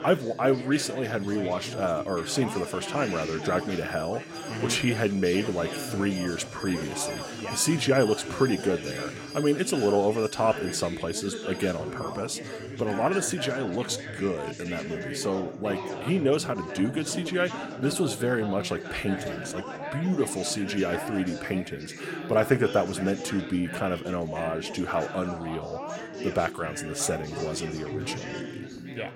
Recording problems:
background chatter; loud; throughout; 4 voices, 8 dB below the speech
alarms or sirens; noticeable; throughout; 15 dB below the speech

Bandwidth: 16.5 kHz